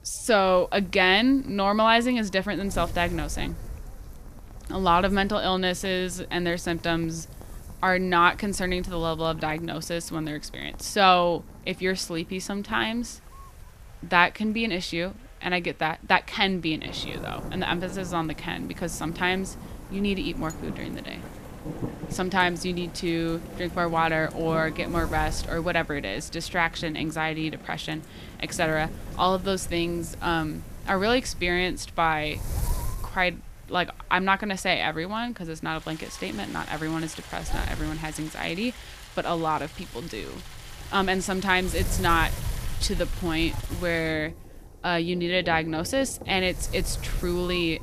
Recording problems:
rain or running water; noticeable; throughout; 15 dB below the speech
wind noise on the microphone; occasional gusts; 25 dB below the speech

